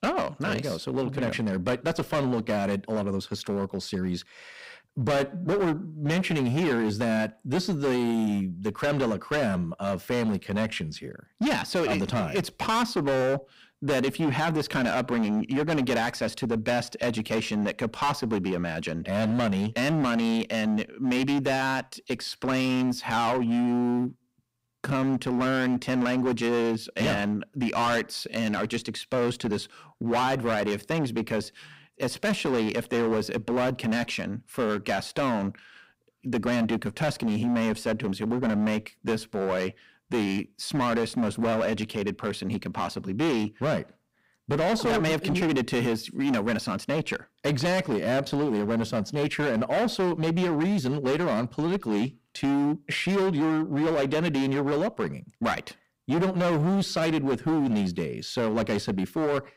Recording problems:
distortion; heavy; 18% of the sound clipped

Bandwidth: 15.5 kHz